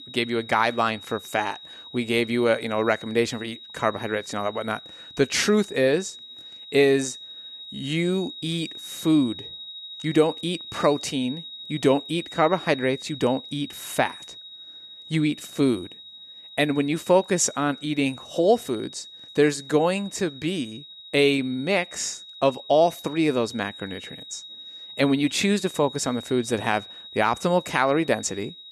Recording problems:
high-pitched whine; noticeable; throughout; 4 kHz, 15 dB below the speech

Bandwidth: 13.5 kHz